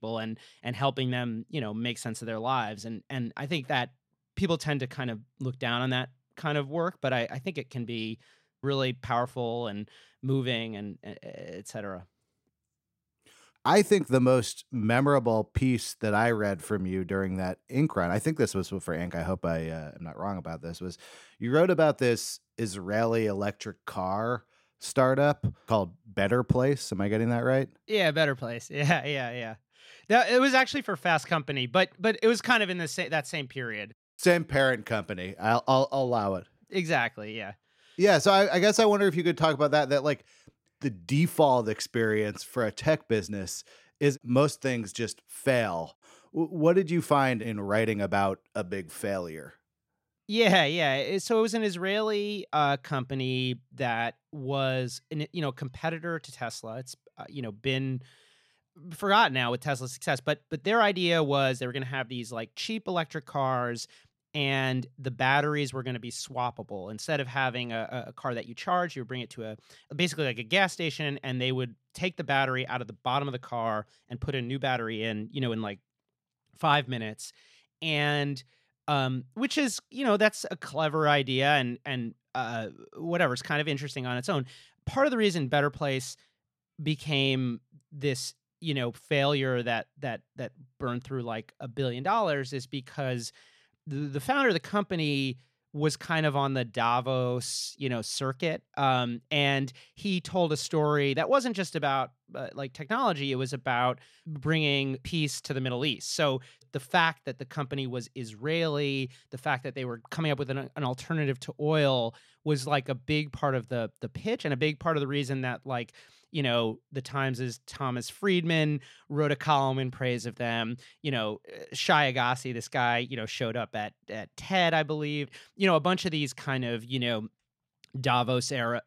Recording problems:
none

